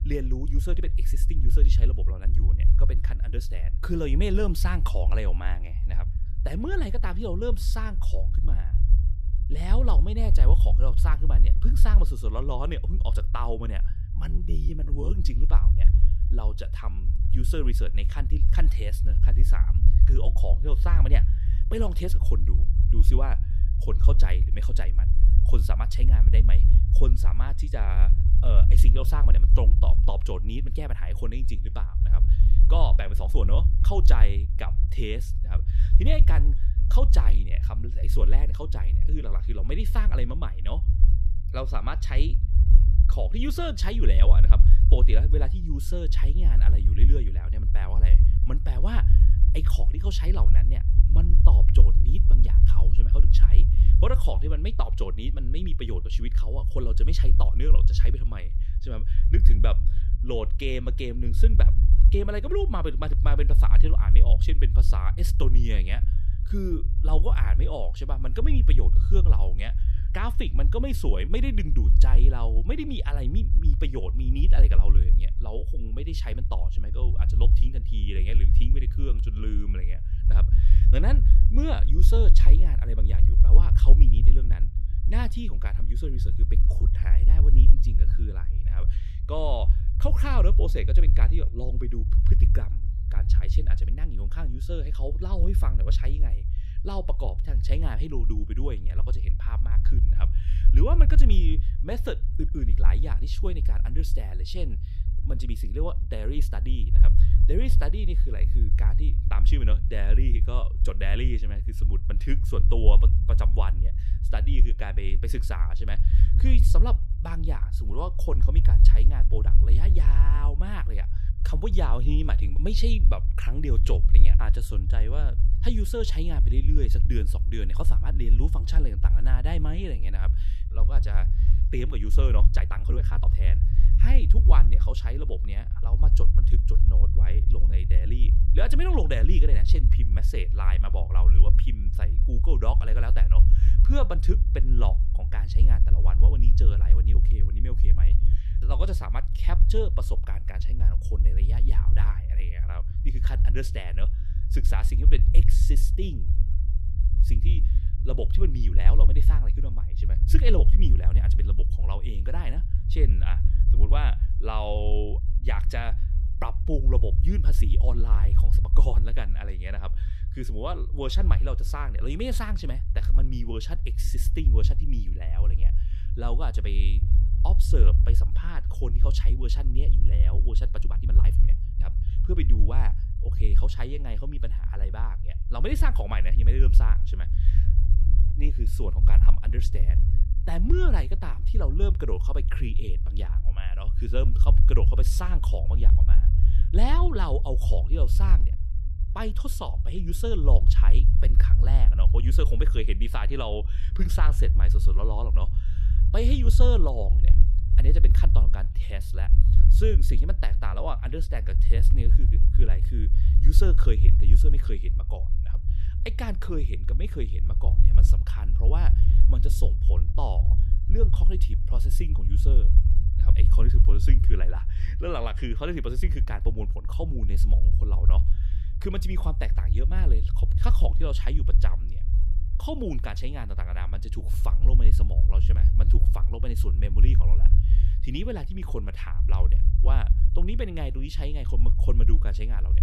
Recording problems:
low rumble; loud; throughout; 7 dB below the speech
uneven, jittery; strongly; from 14 s to 3:02

